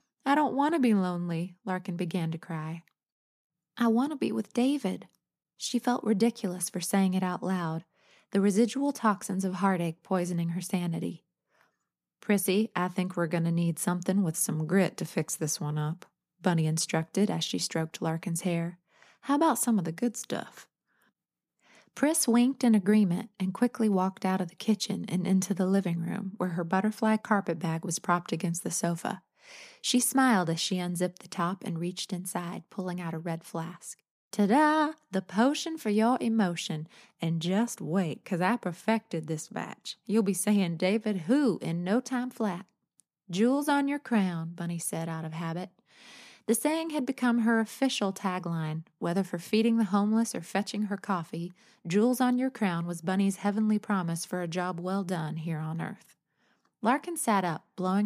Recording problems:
abrupt cut into speech; at the end

